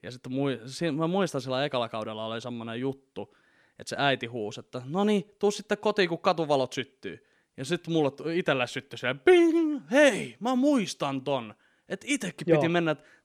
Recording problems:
none

